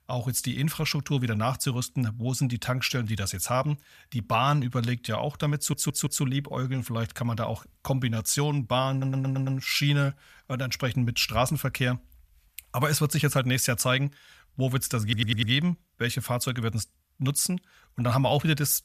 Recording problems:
audio stuttering; at 5.5 s, at 9 s and at 15 s

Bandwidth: 14.5 kHz